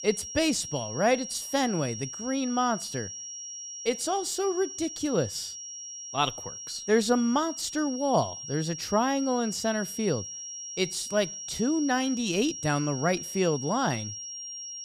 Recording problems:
high-pitched whine; loud; throughout; 5.5 kHz, 8 dB below the speech

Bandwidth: 15 kHz